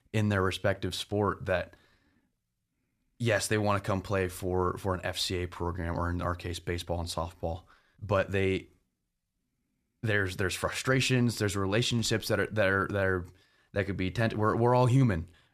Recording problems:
none

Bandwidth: 14.5 kHz